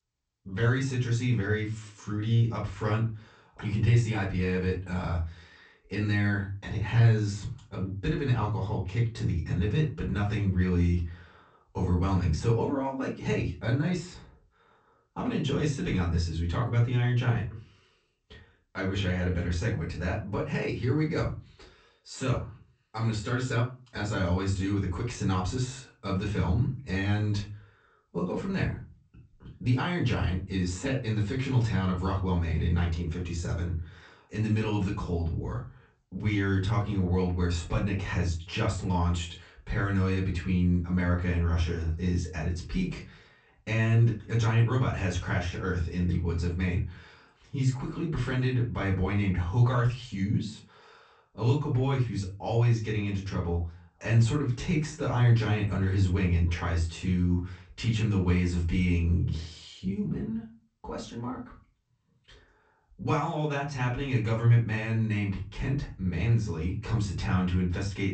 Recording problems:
off-mic speech; far
room echo; slight; dies away in 0.3 s
garbled, watery; slightly; nothing above 8 kHz

